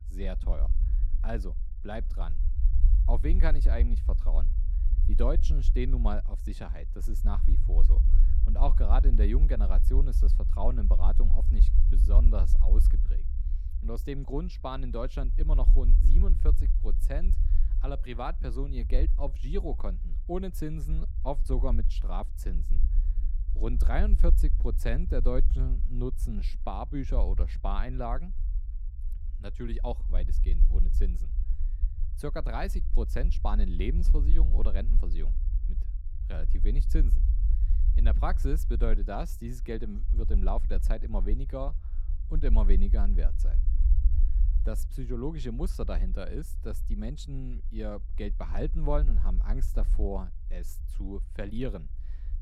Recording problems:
low rumble; noticeable; throughout; 10 dB below the speech

